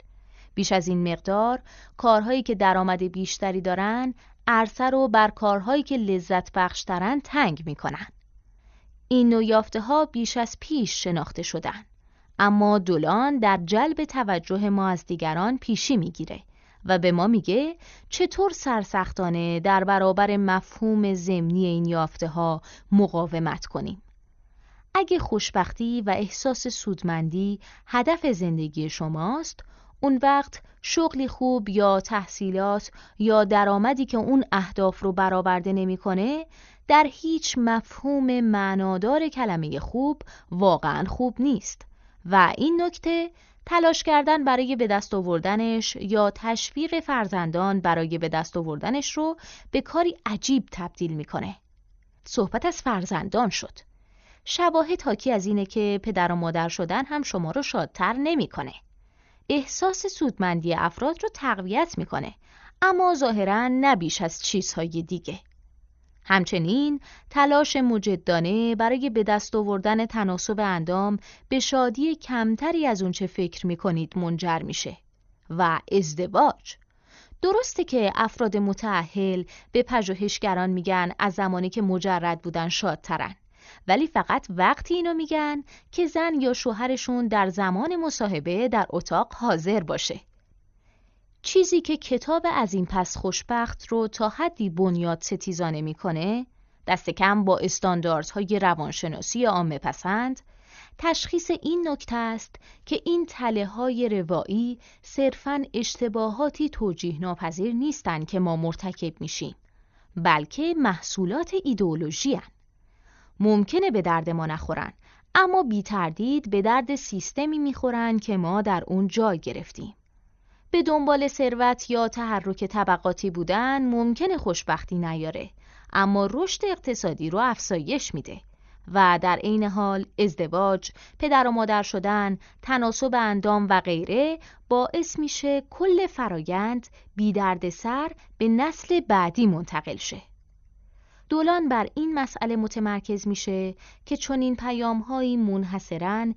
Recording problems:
garbled, watery; slightly; nothing above 6.5 kHz

